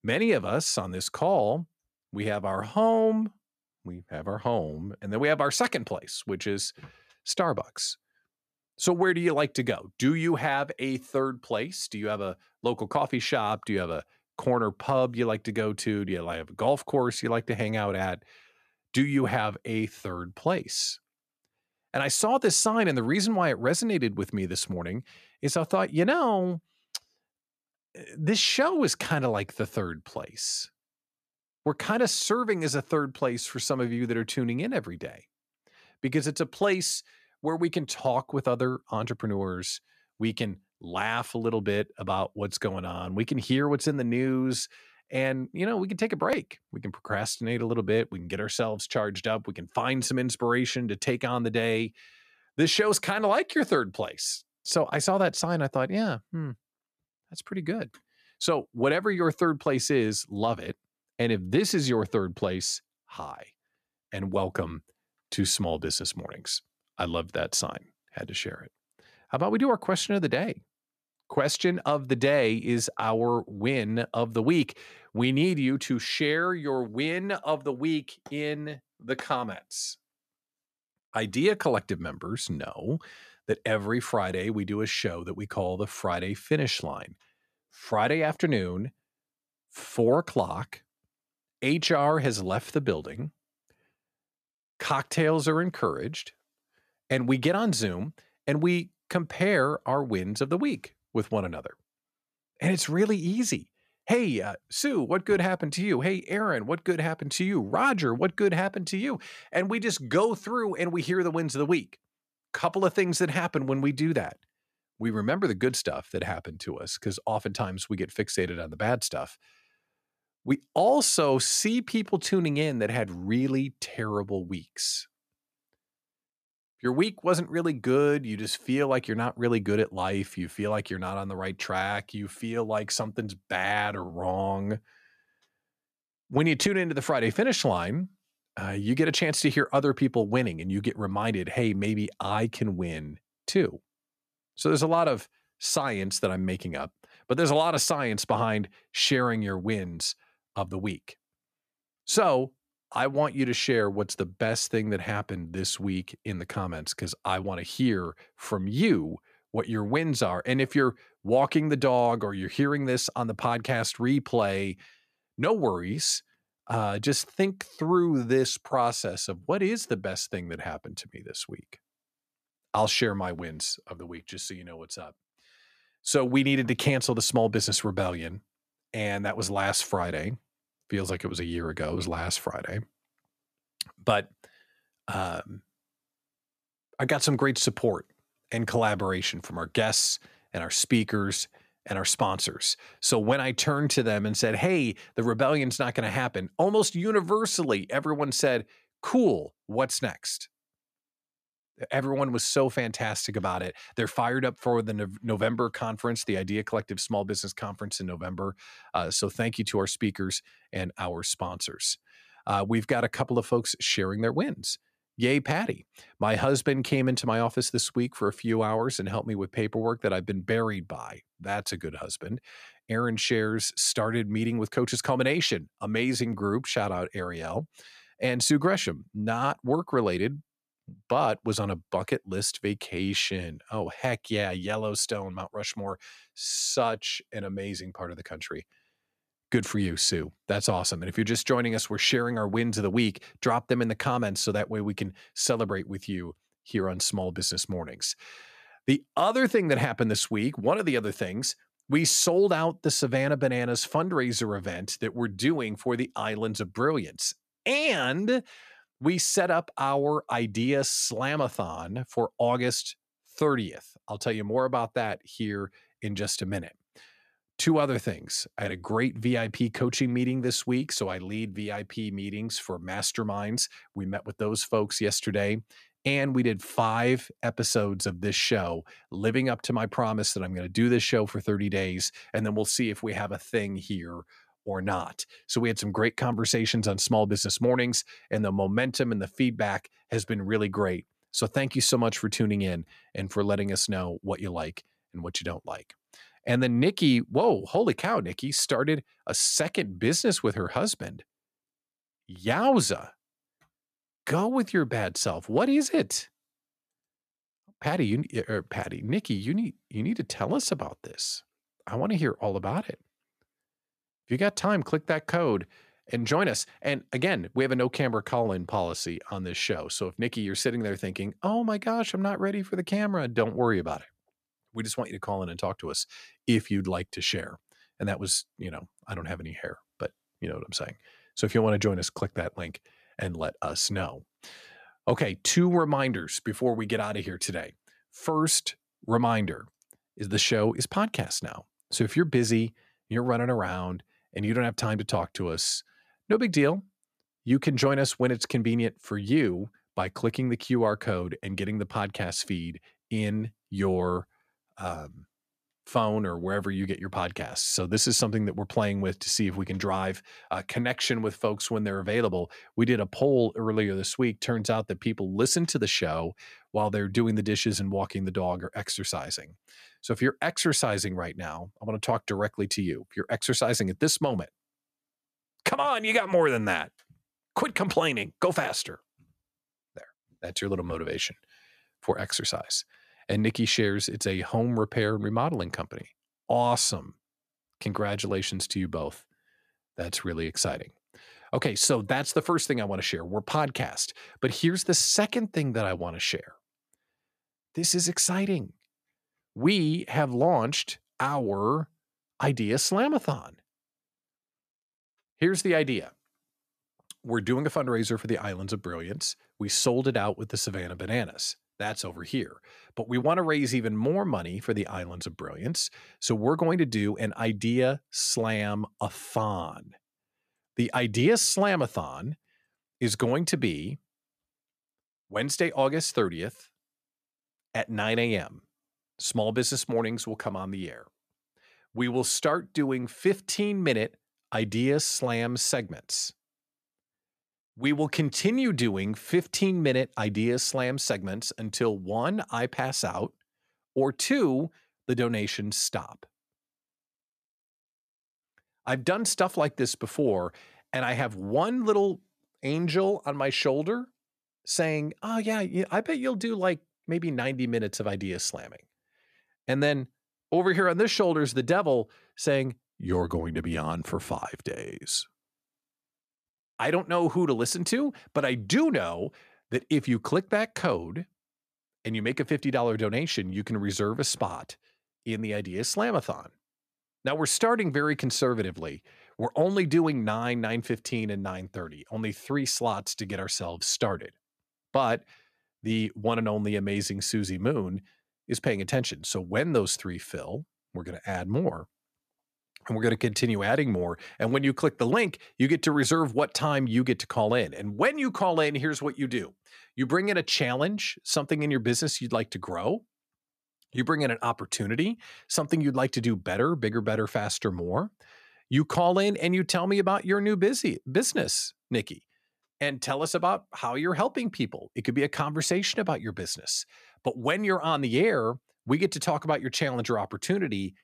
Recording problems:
none

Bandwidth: 14.5 kHz